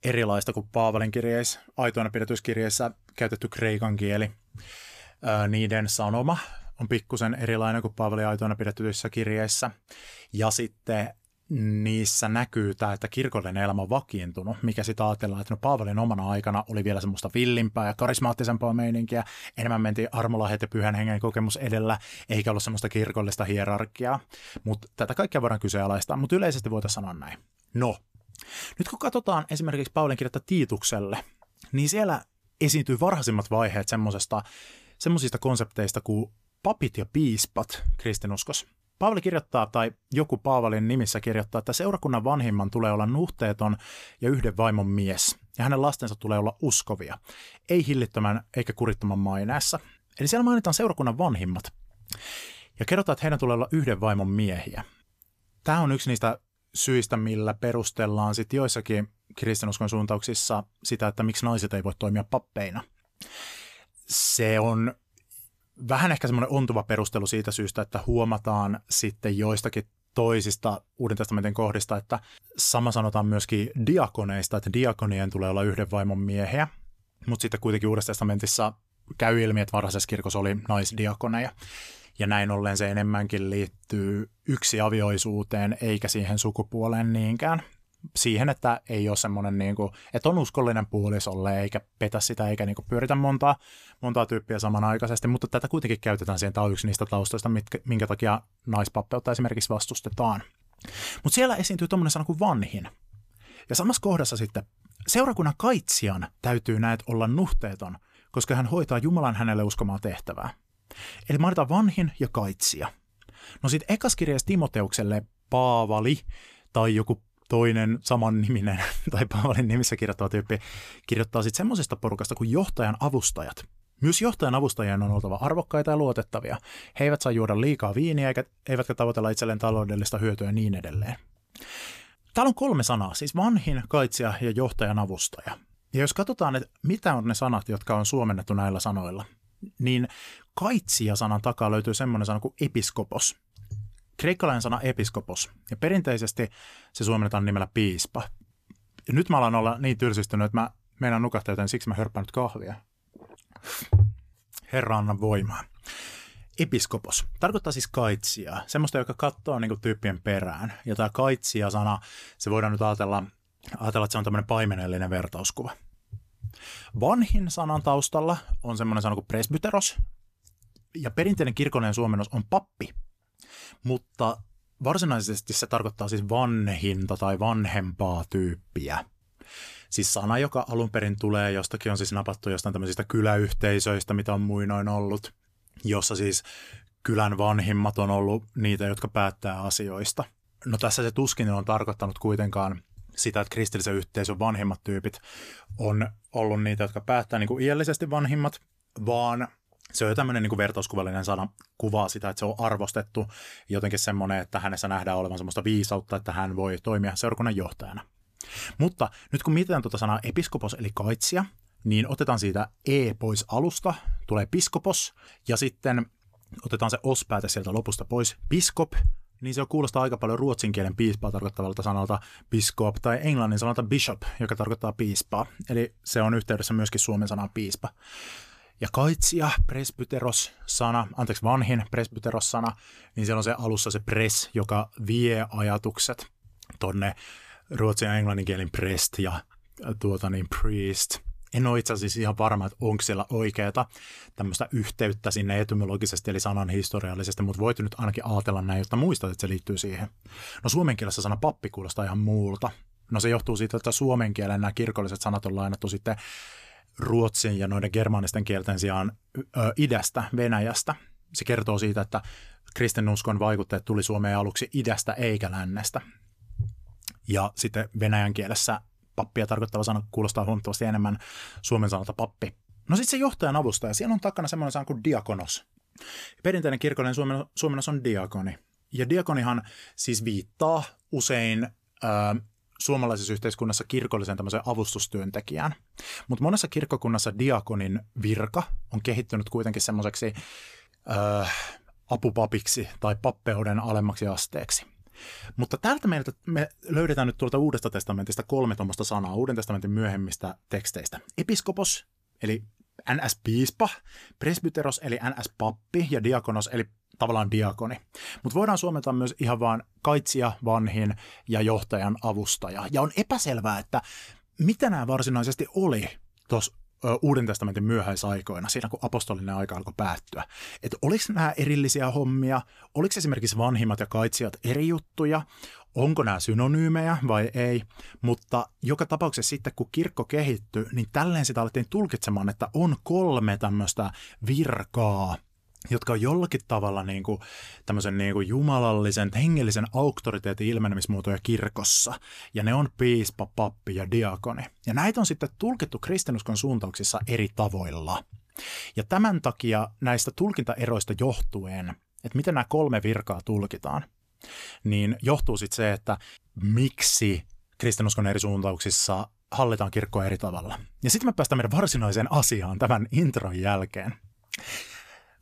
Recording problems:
none

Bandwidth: 14.5 kHz